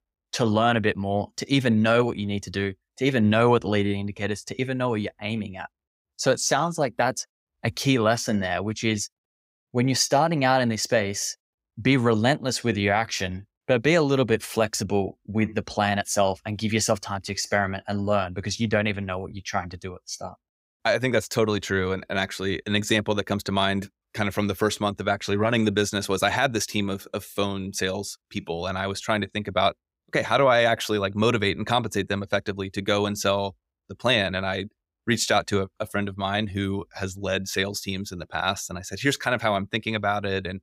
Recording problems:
none

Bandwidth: 15.5 kHz